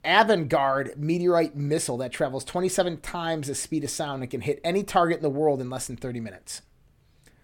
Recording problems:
none

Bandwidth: 17 kHz